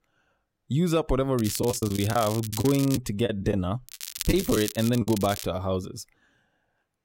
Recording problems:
crackling; loud; from 1.5 to 3 s and from 4 to 5.5 s; 9 dB below the speech
choppy; very; from 1.5 to 5 s; 11% of the speech affected

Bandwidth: 16 kHz